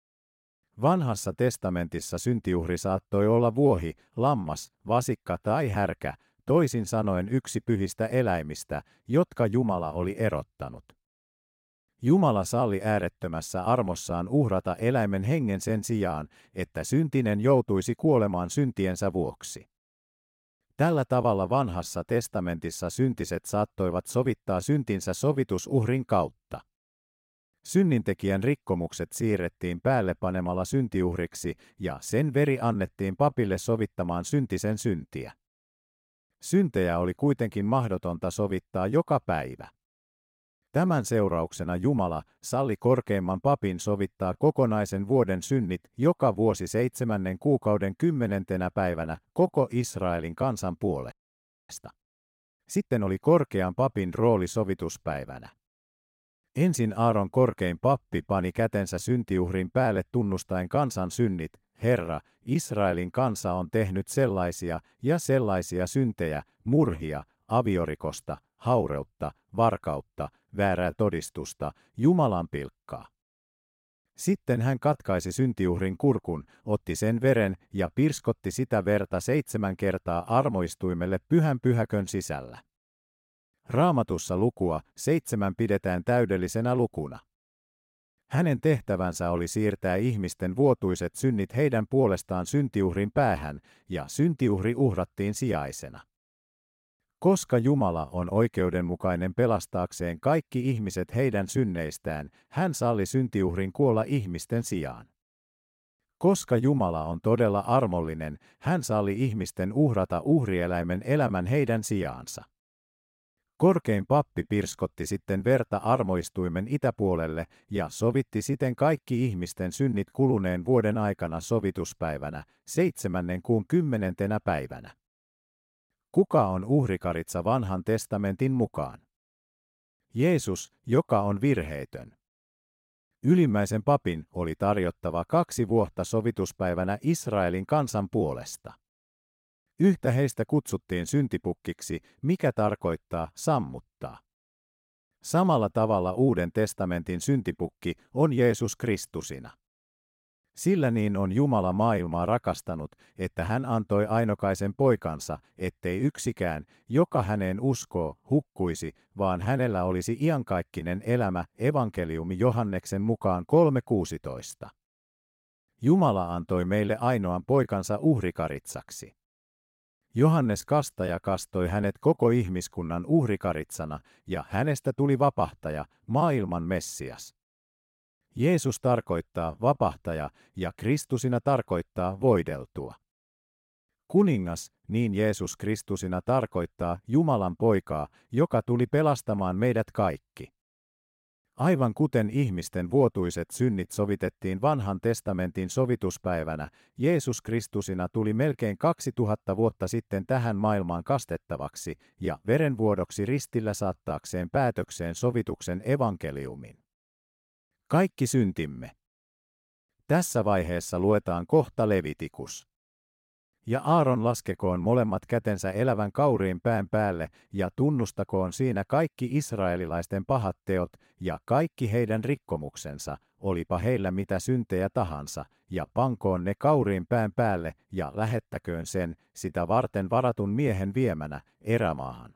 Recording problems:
audio freezing; at 51 s for 0.5 s

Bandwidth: 16 kHz